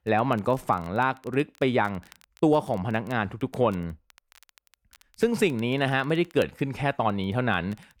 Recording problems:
crackle, like an old record; faint; 30 dB below the speech

